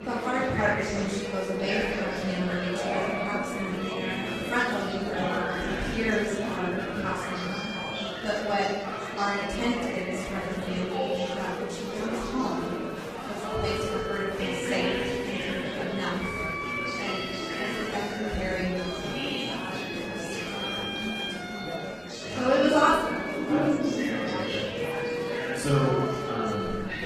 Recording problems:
off-mic speech; far
room echo; noticeable; dies away in 1.1 s
garbled, watery; slightly; nothing above 14.5 kHz
background music; loud; throughout; 6 dB below the speech
murmuring crowd; loud; throughout; 3 dB below the speech

